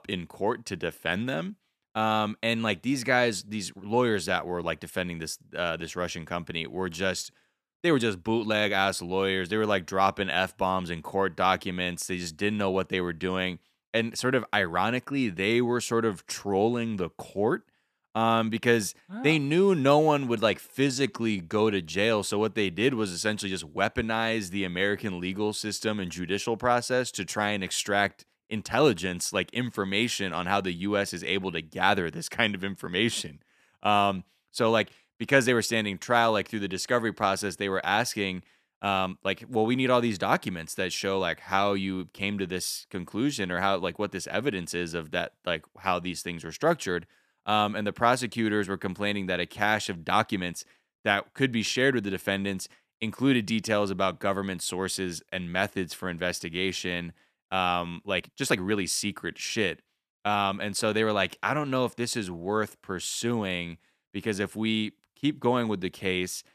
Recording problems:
uneven, jittery; strongly; from 8 to 59 s

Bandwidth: 14.5 kHz